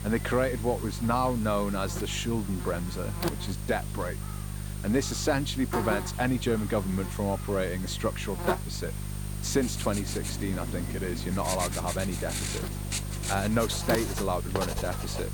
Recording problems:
electrical hum; loud; throughout; 50 Hz, 9 dB below the speech
household noises; loud; from 10 s on; 6 dB below the speech

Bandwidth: 18.5 kHz